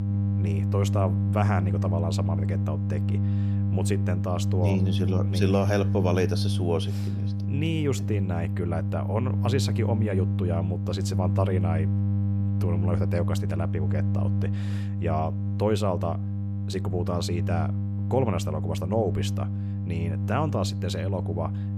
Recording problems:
electrical hum; loud; throughout; 50 Hz, 7 dB below the speech

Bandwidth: 14.5 kHz